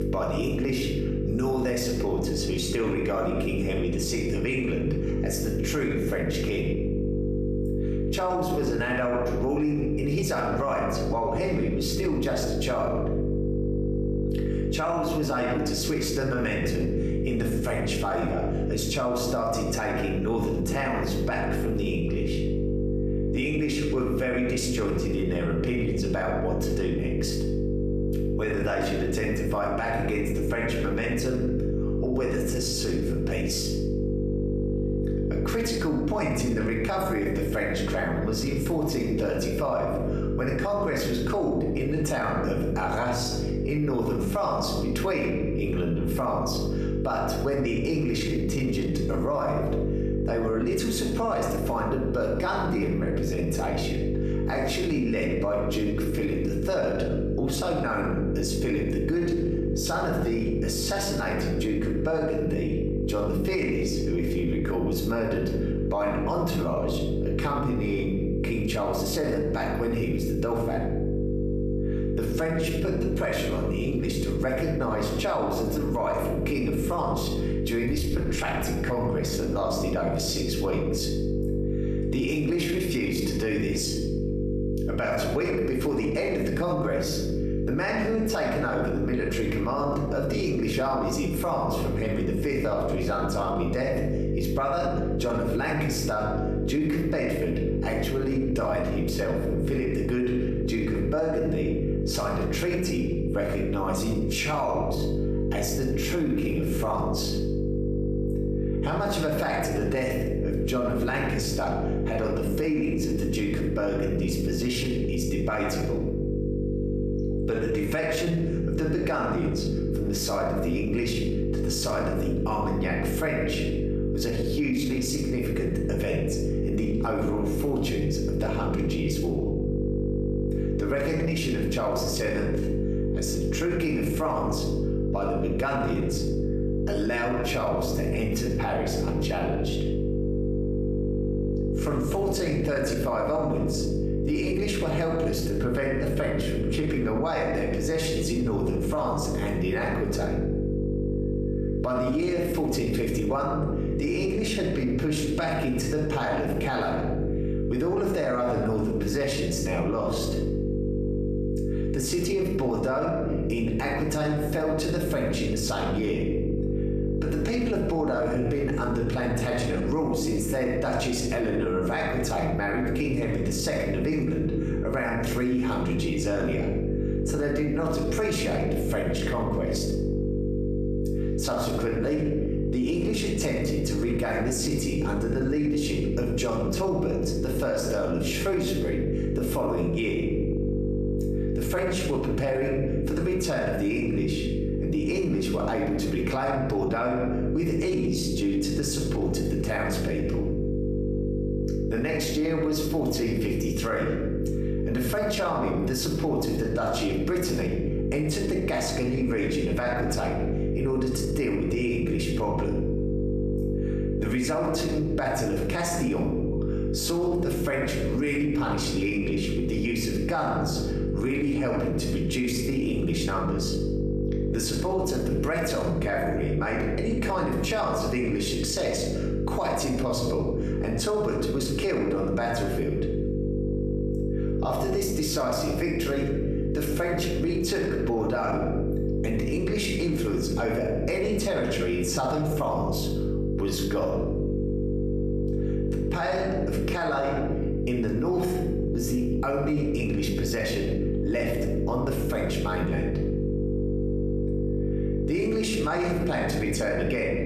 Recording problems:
room echo; slight; dies away in 0.7 s
off-mic speech; somewhat distant
squashed, flat; somewhat
electrical hum; loud; throughout; 50 Hz, 6 dB below the speech

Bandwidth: 14.5 kHz